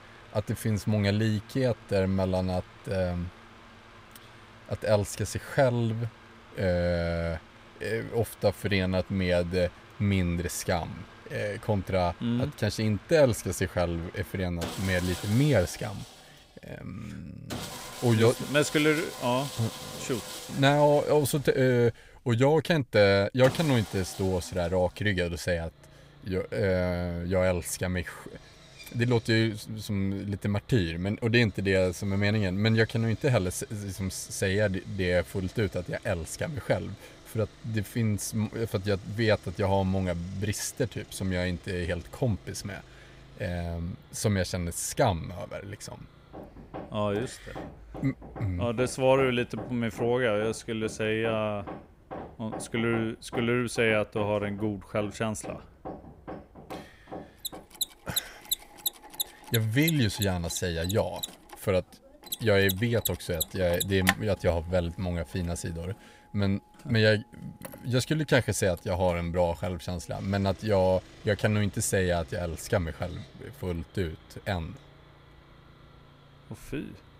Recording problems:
machinery noise; noticeable; throughout; 15 dB below the speech

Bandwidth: 15.5 kHz